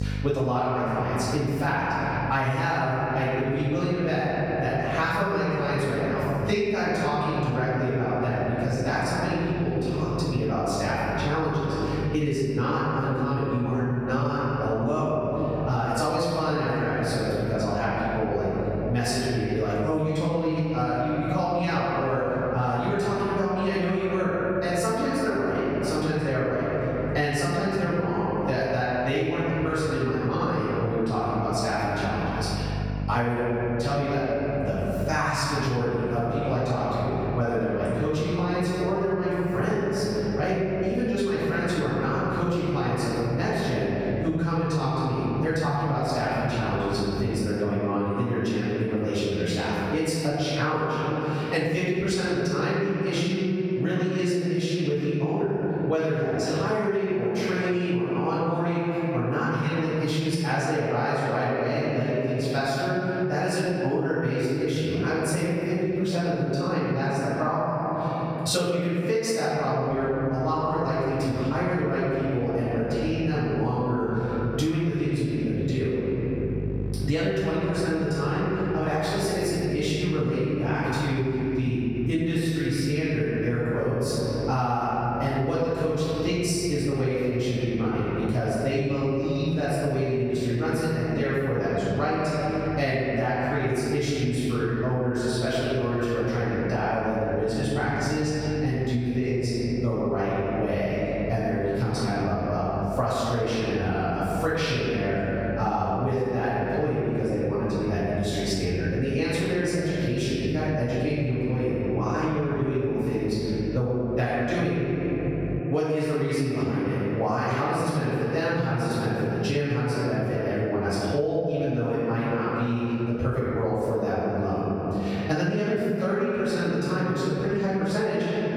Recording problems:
room echo; strong; dies away in 2.3 s
off-mic speech; far
squashed, flat; somewhat
electrical hum; faint; until 47 s and from 1:10 to 1:56; 50 Hz, 25 dB below the speech

